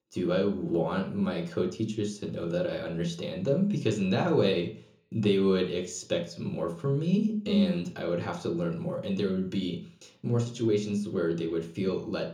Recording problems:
room echo; slight; dies away in 0.7 s
off-mic speech; somewhat distant

